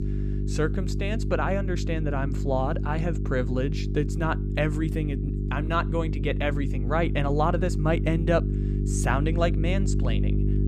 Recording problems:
electrical hum; loud; throughout; 50 Hz, 9 dB below the speech

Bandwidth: 14.5 kHz